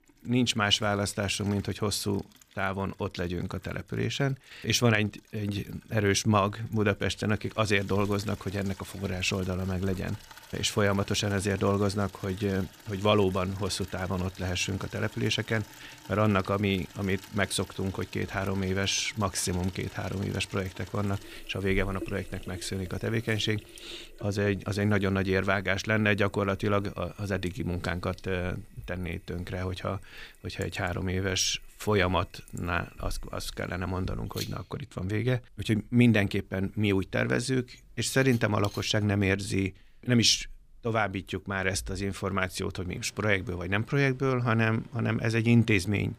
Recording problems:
household noises; faint; throughout; 20 dB below the speech

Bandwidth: 15 kHz